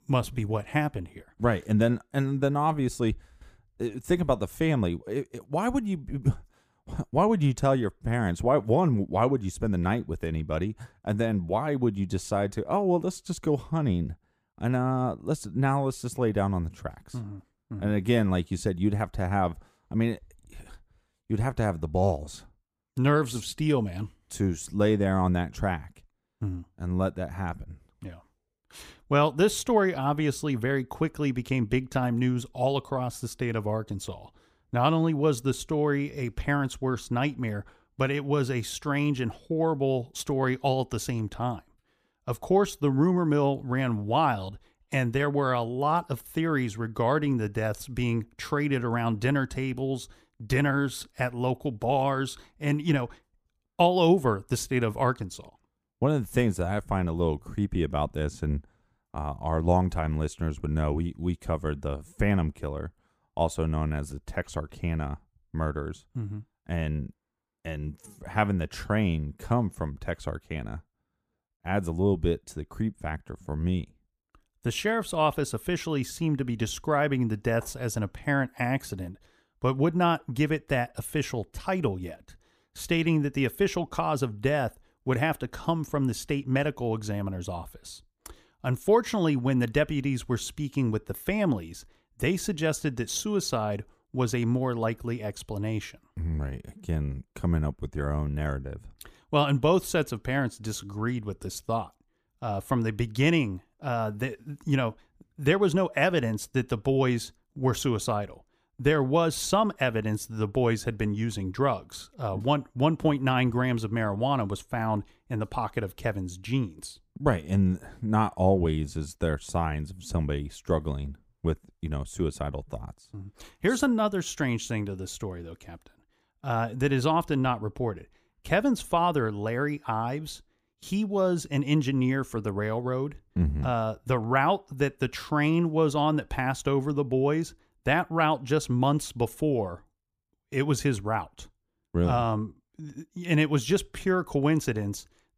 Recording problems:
none

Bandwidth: 15 kHz